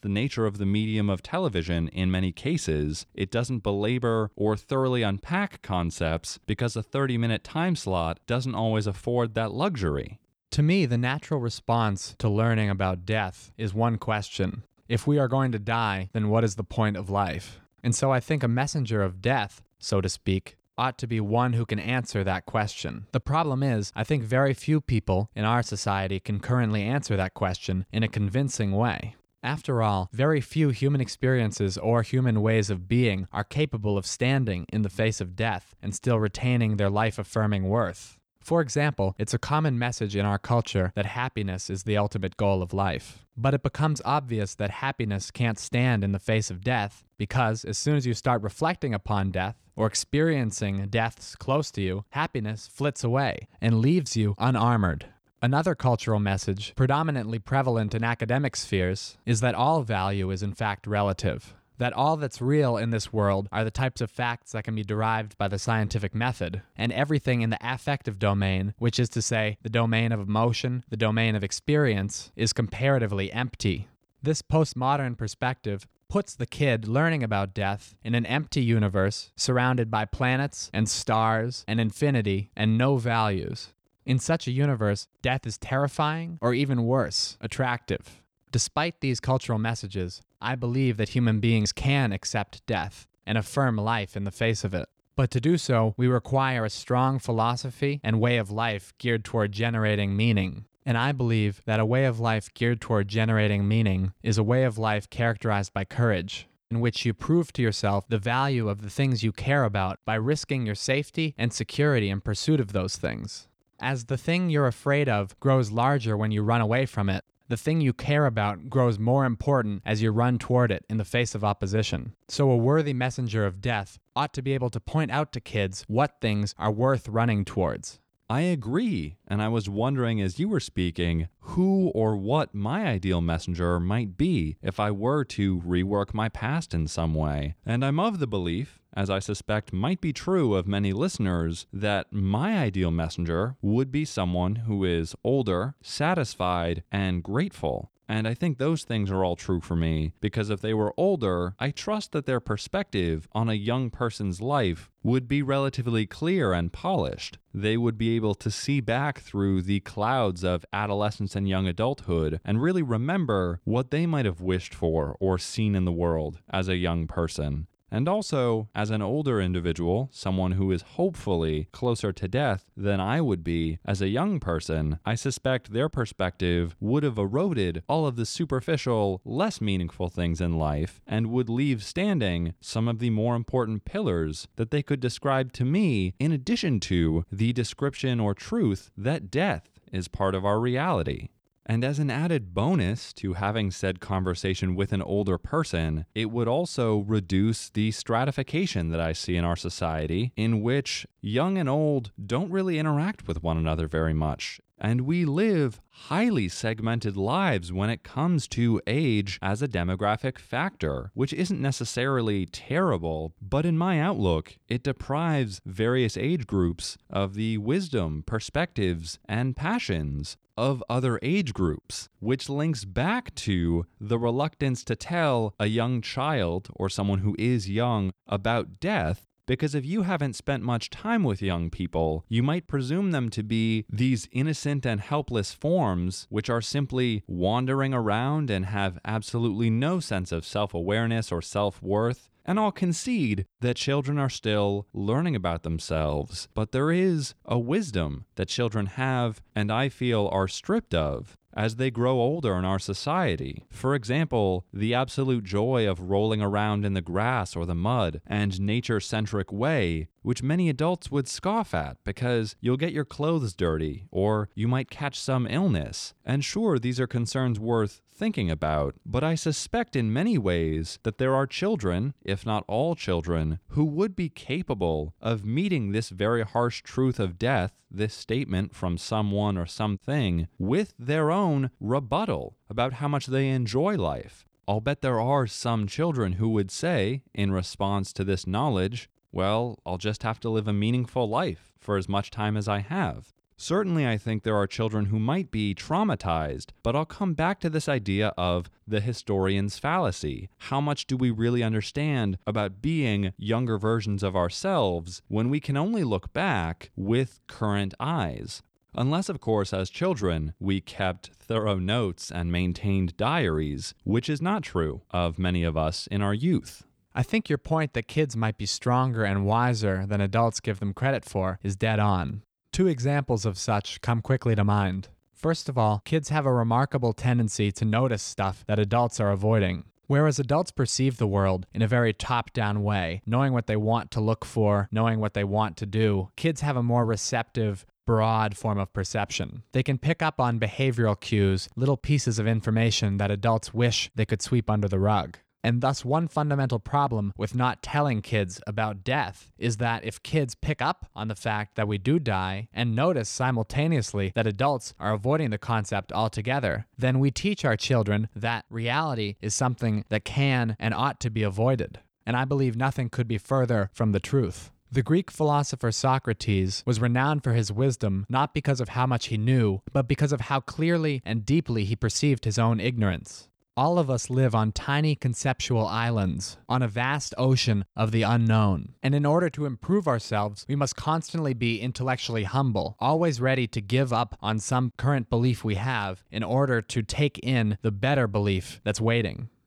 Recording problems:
none

